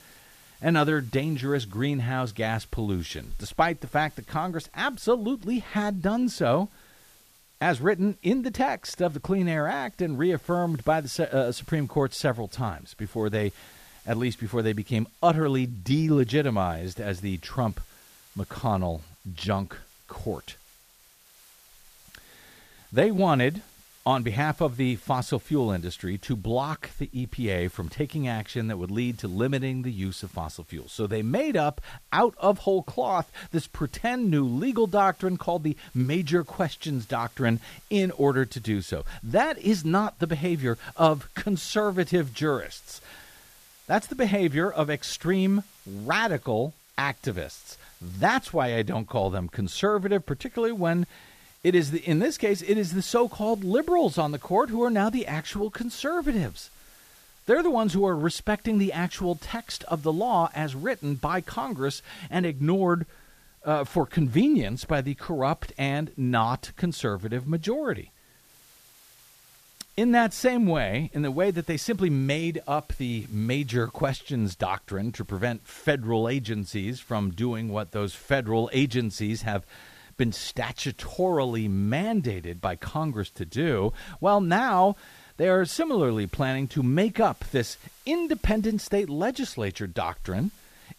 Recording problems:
hiss; faint; throughout; 25 dB below the speech

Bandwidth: 14.5 kHz